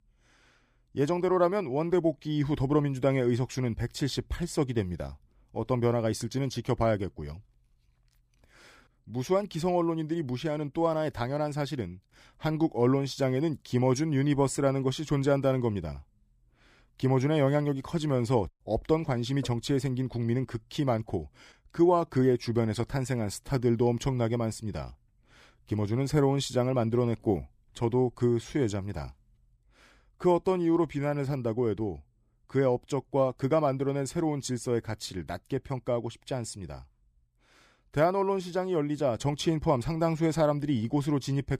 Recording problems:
none

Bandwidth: 15 kHz